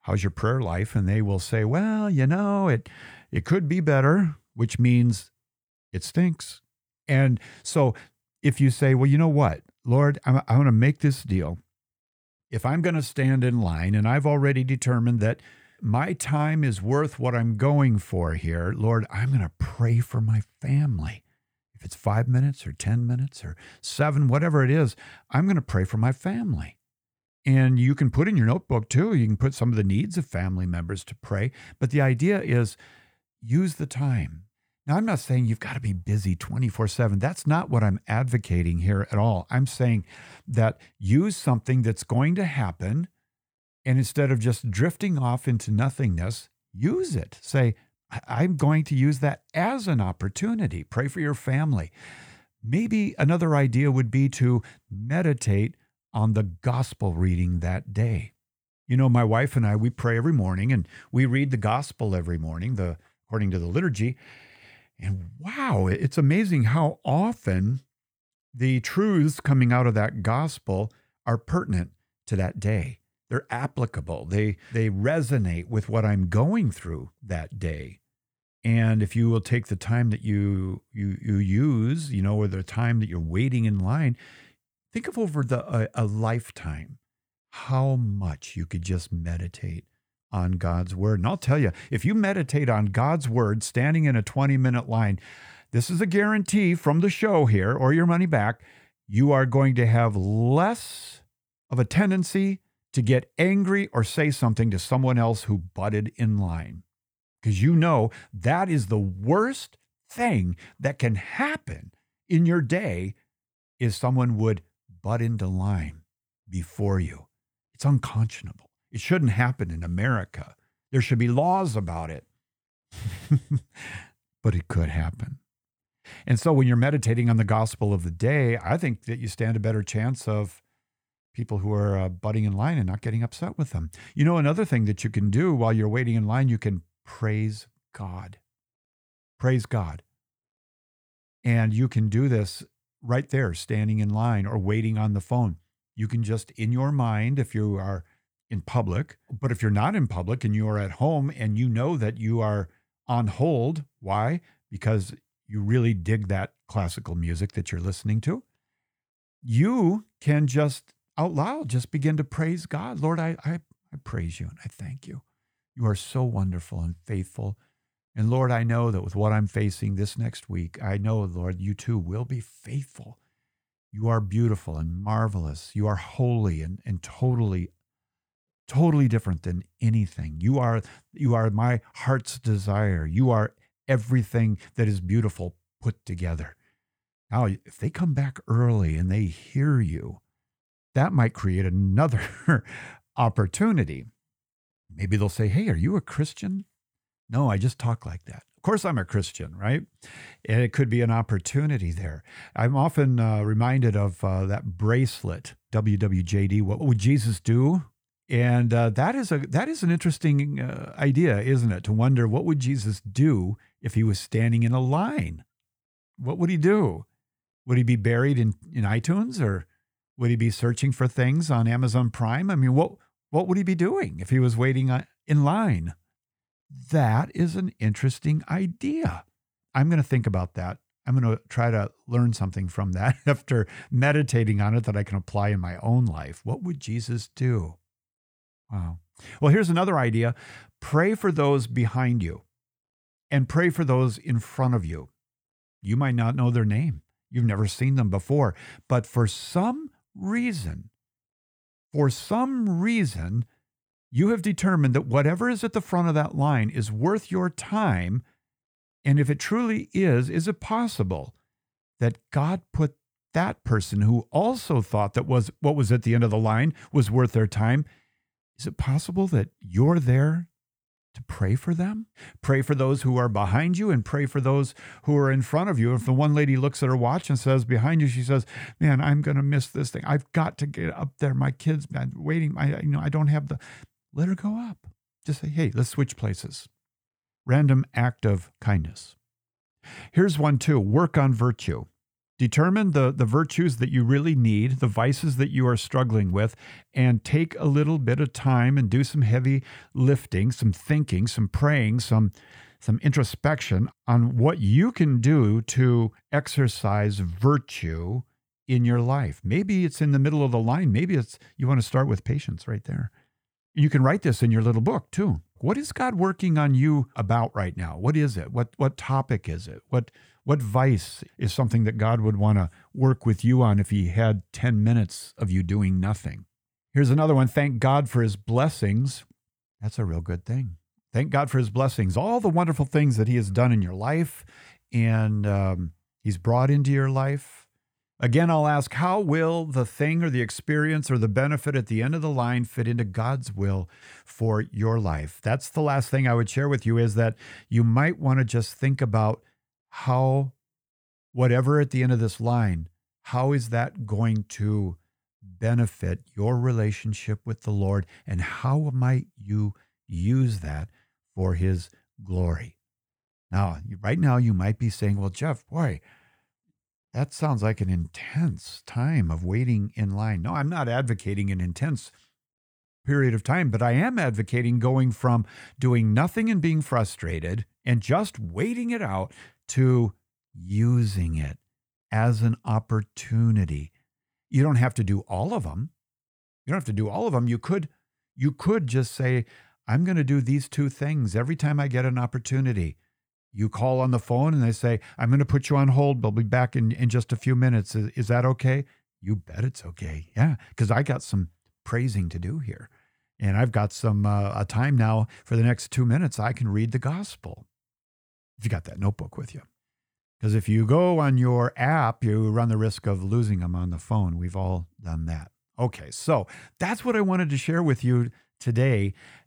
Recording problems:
none

